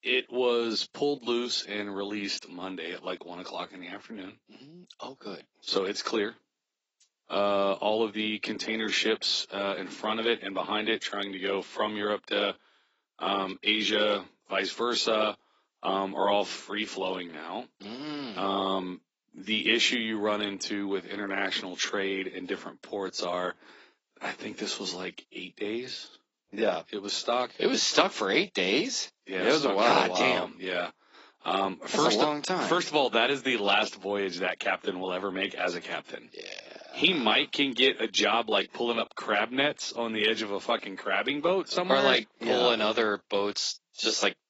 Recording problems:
garbled, watery; badly; nothing above 7.5 kHz
thin; somewhat; fading below 300 Hz

